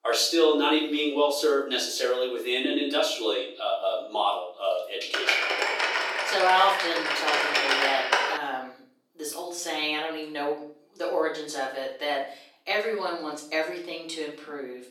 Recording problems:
off-mic speech; far
thin; somewhat; fading below 400 Hz
room echo; slight; dies away in 0.5 s
keyboard typing; loud; from 5 to 8.5 s; peak 5 dB above the speech

